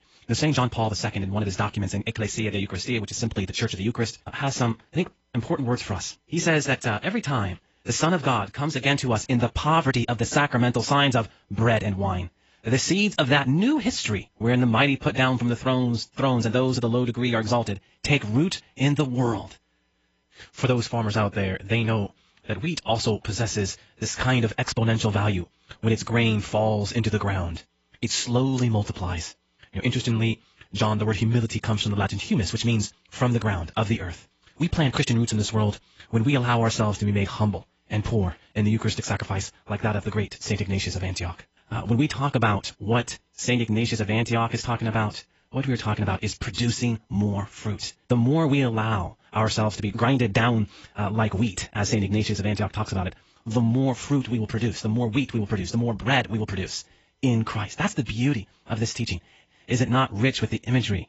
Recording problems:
garbled, watery; badly; nothing above 7.5 kHz
wrong speed, natural pitch; too fast; 1.6 times normal speed

